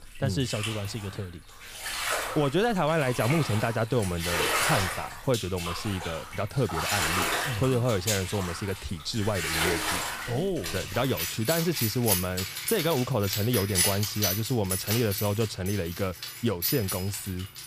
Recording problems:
household noises; loud; throughout; 1 dB below the speech

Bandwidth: 15 kHz